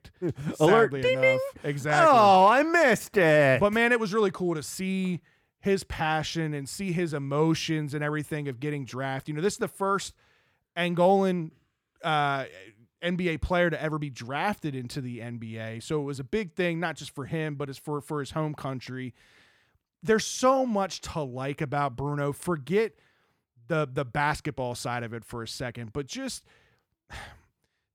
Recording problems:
none

